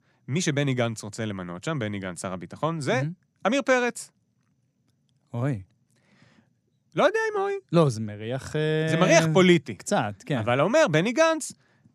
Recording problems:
none

